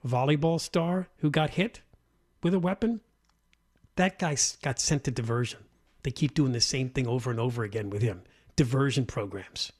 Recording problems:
none

